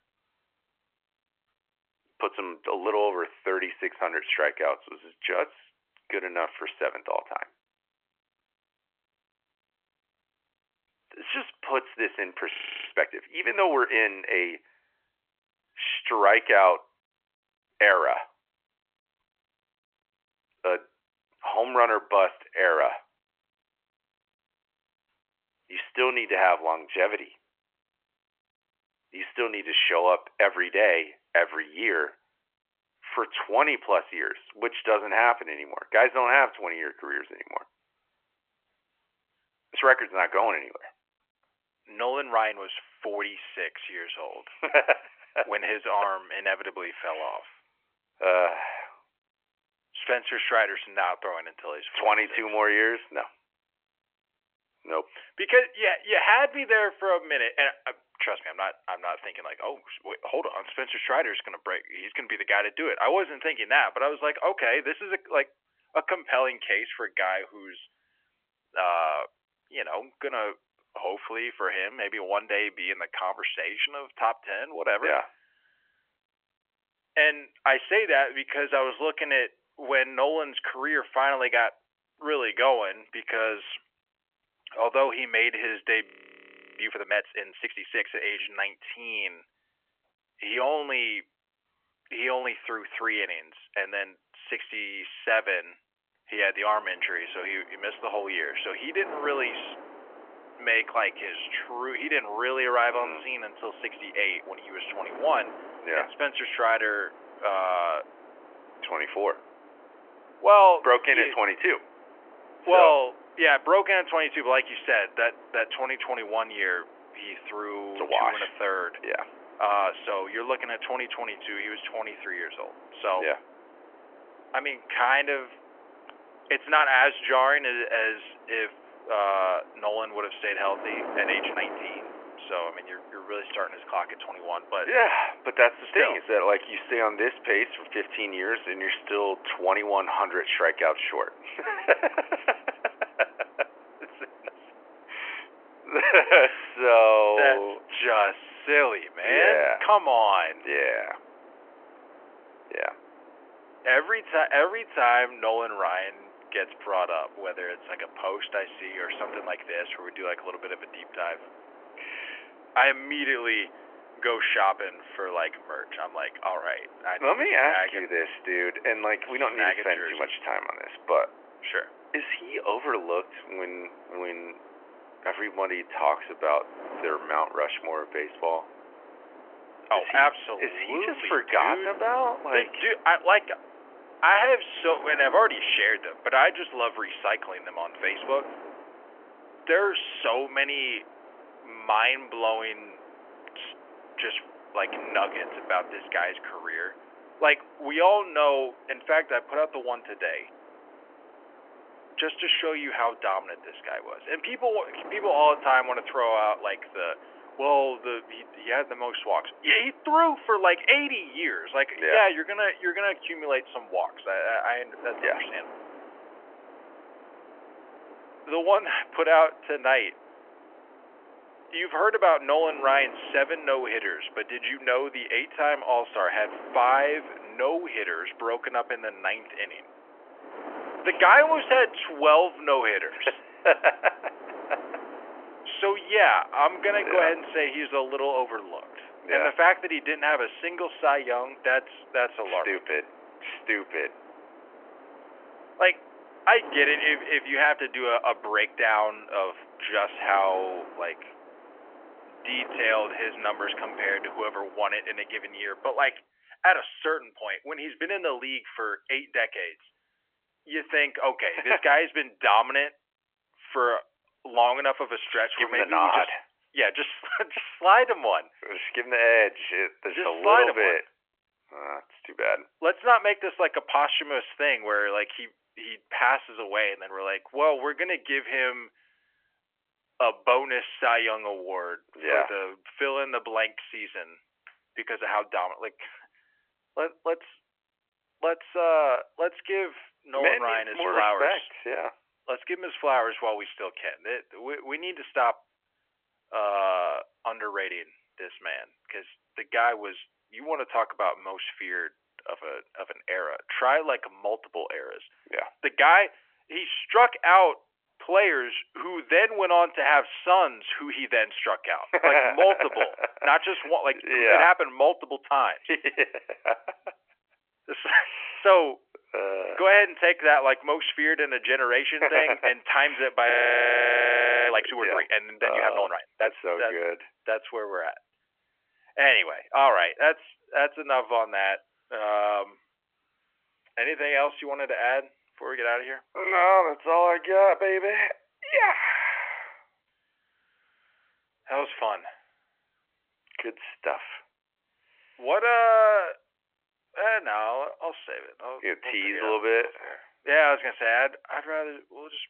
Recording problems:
thin; very; fading below 700 Hz
phone-call audio; nothing above 3 kHz
wind noise on the microphone; occasional gusts; from 1:37 to 4:16; 20 dB below the speech
audio freezing; at 13 s, at 1:26 for 0.5 s and at 5:24 for 1 s

